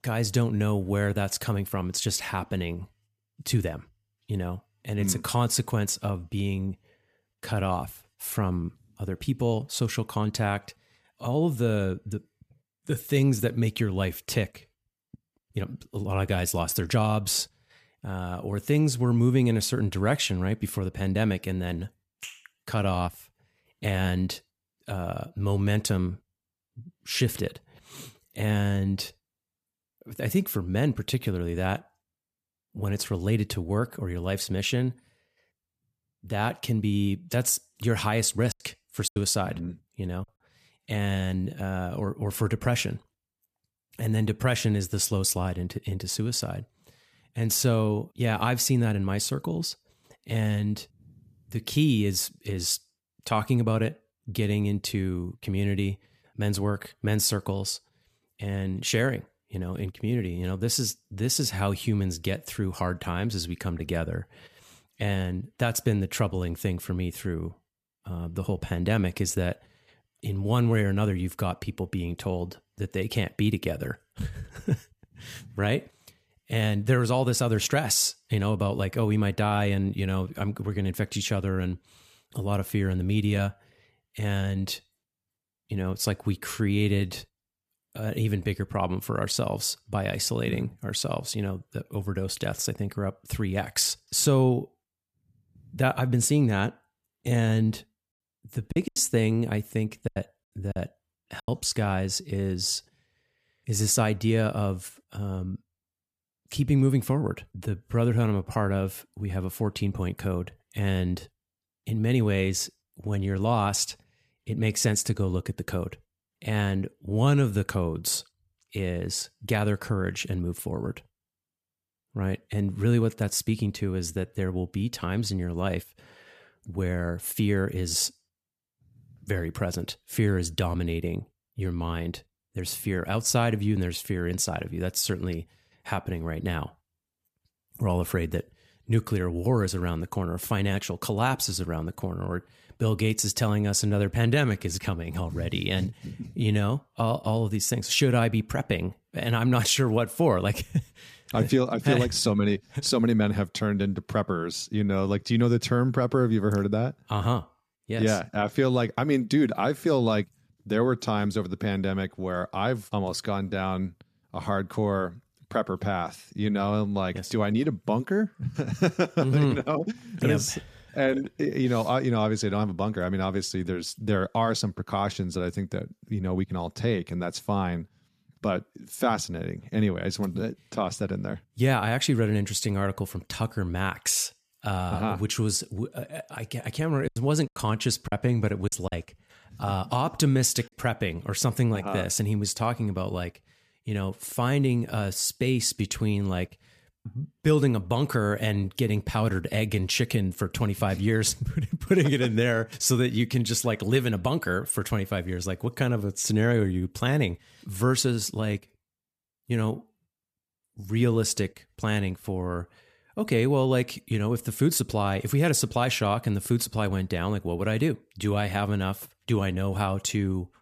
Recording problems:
choppy; very; from 39 to 40 s, from 1:39 to 1:41 and from 3:07 to 3:11; 12% of the speech affected

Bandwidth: 14.5 kHz